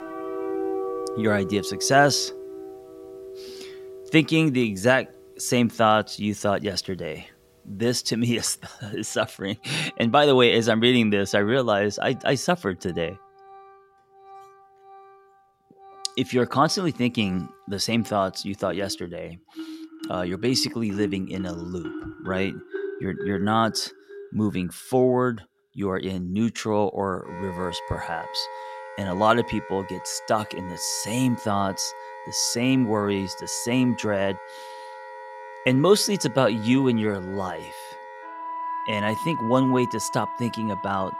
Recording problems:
background music; noticeable; throughout; 10 dB below the speech

